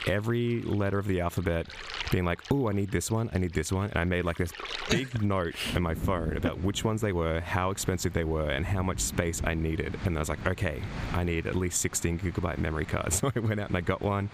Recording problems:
squashed, flat; somewhat, background pumping
rain or running water; noticeable; throughout; 10 dB below the speech

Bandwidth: 15 kHz